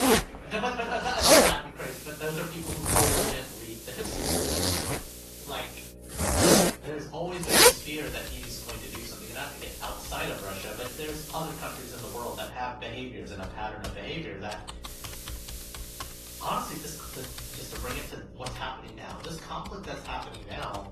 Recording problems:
off-mic speech; far
room echo; slight; dies away in 0.4 s
garbled, watery; slightly; nothing above 12 kHz
household noises; very loud; throughout; 15 dB above the speech
hiss; loud; from 2 to 6 s, from 7.5 to 12 s and from 15 to 18 s; 6 dB below the speech
electrical hum; noticeable; throughout; 60 Hz, 20 dB below the speech

